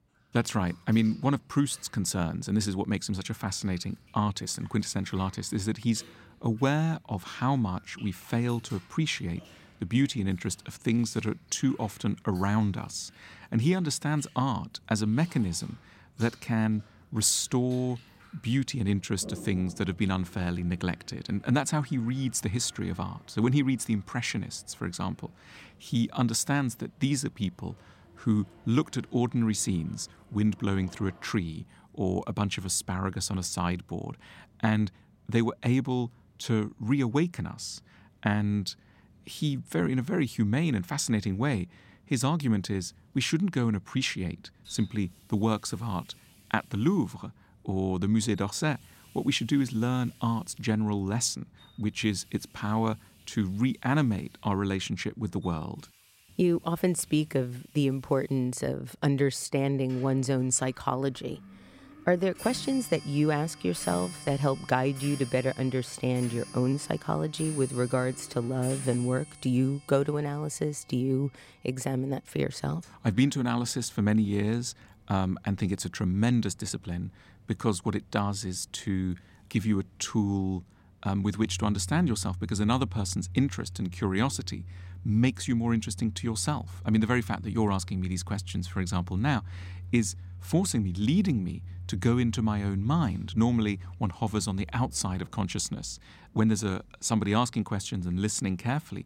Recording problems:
household noises; noticeable; throughout; 15 dB below the speech

